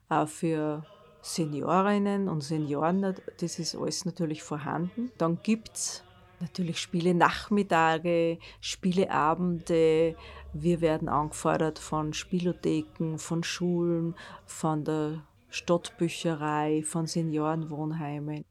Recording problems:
voice in the background; faint; throughout; 30 dB below the speech

